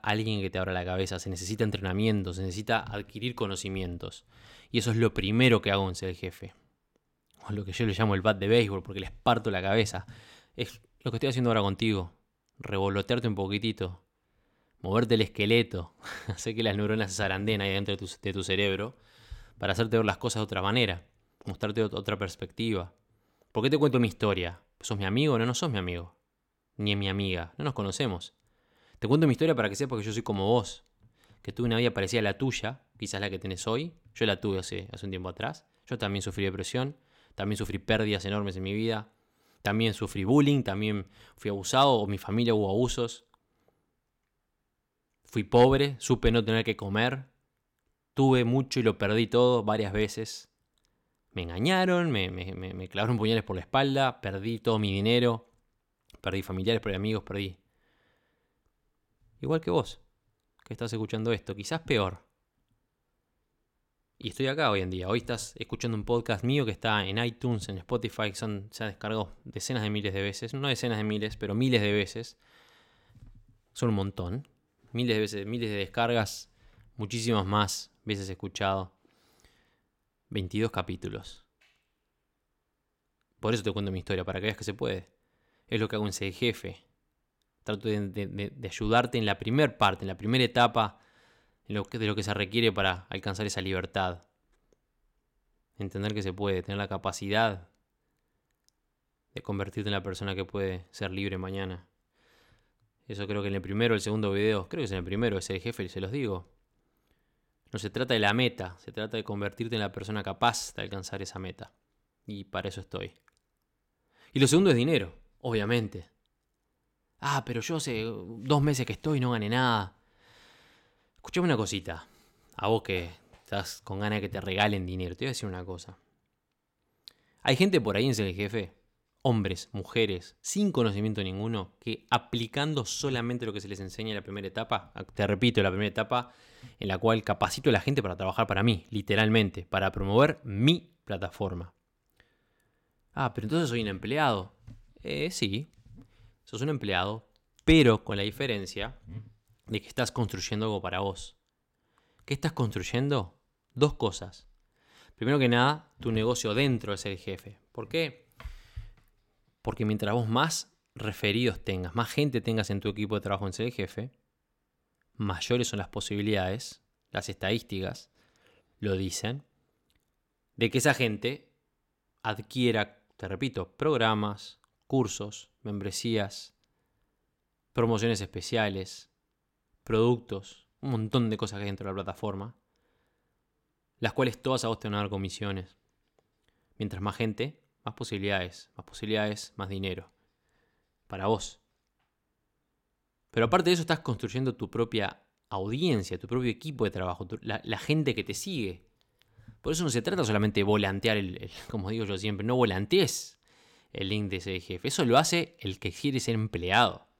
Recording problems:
none

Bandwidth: 16.5 kHz